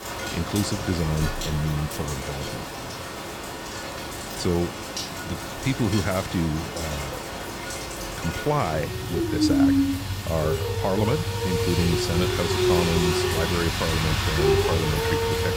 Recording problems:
rain or running water; very loud; throughout; 1 dB above the speech

